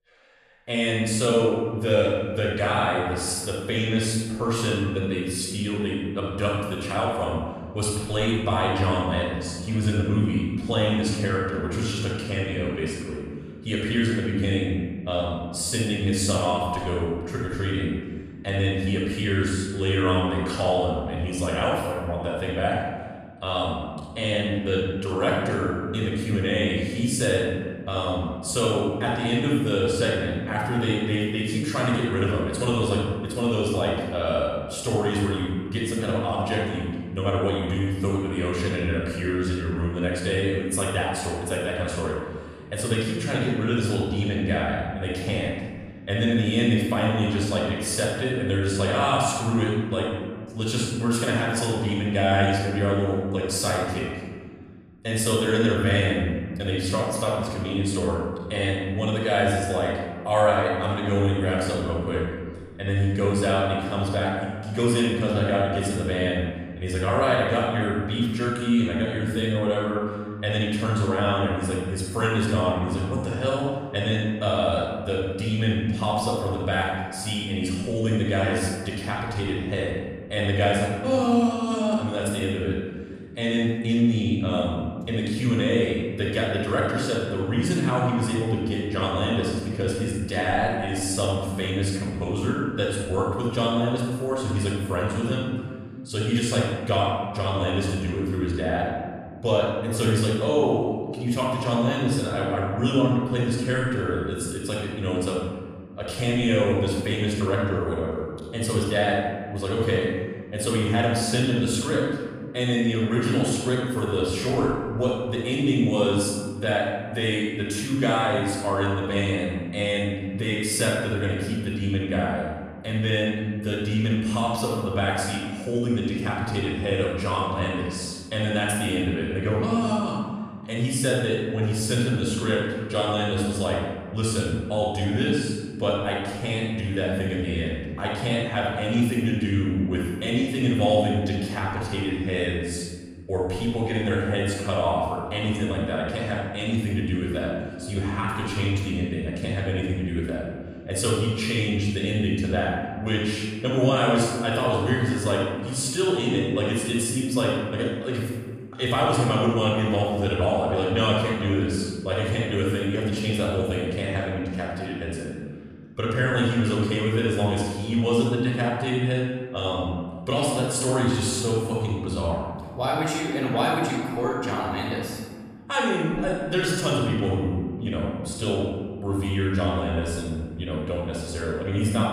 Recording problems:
room echo; strong; dies away in 1.7 s
off-mic speech; far

